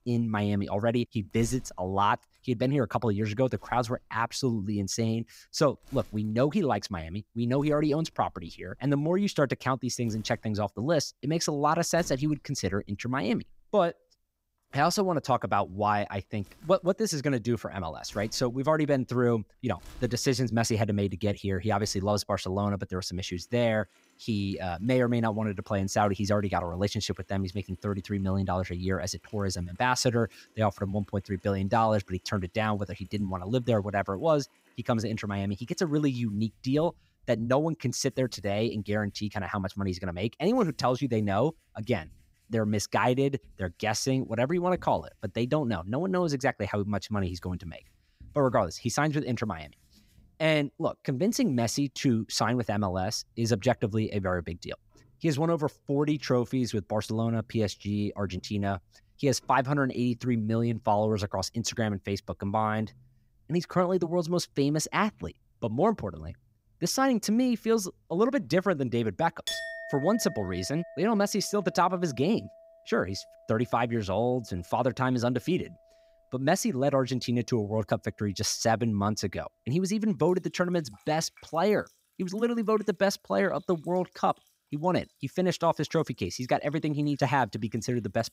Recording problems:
household noises; faint; throughout; 20 dB below the speech

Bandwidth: 15.5 kHz